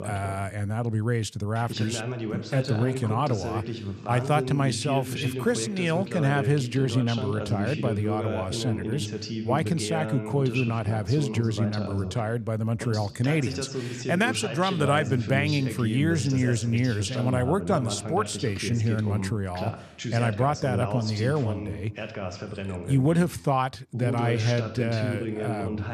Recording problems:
voice in the background; loud; throughout; 6 dB below the speech

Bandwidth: 14.5 kHz